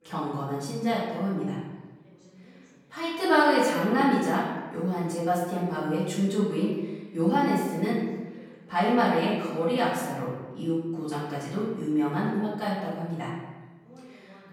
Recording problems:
off-mic speech; far
room echo; noticeable; dies away in 1.1 s
voice in the background; faint; throughout; 30 dB below the speech

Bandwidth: 17 kHz